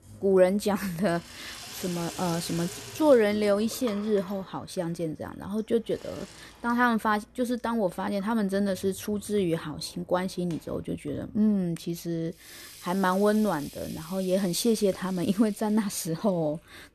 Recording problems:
household noises; noticeable; throughout; 15 dB below the speech

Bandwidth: 13.5 kHz